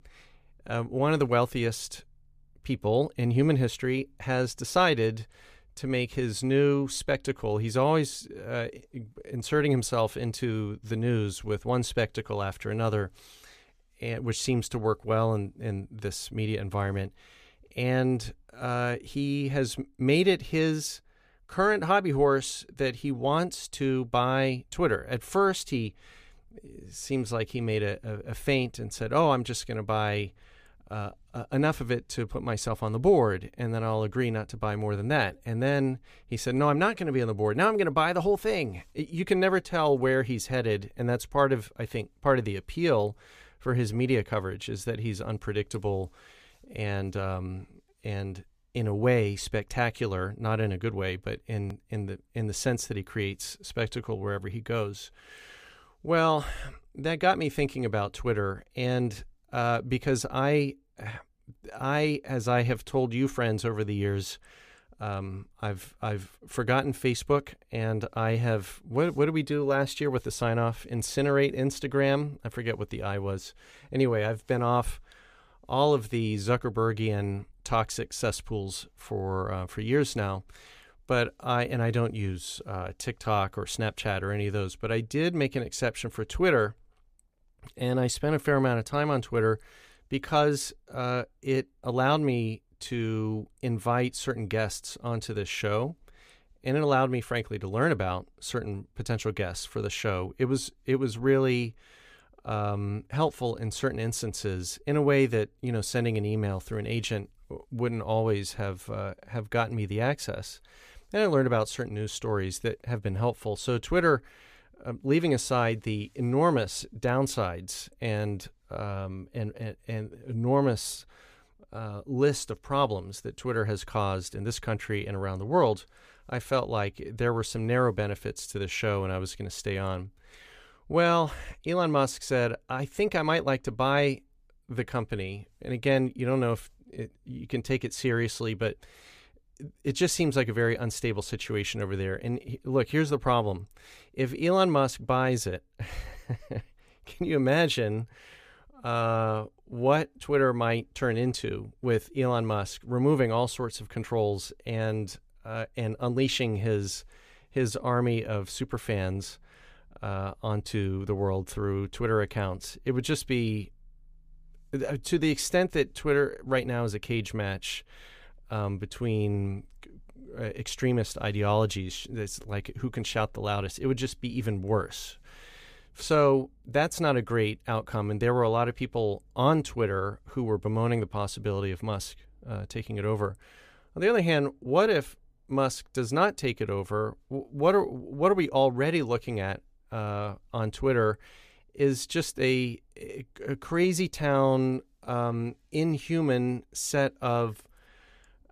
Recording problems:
none

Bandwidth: 15 kHz